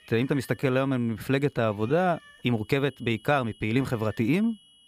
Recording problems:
high-pitched whine; faint; throughout; 3 kHz, 30 dB below the speech
animal sounds; faint; throughout; 25 dB below the speech
uneven, jittery; strongly

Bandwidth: 15 kHz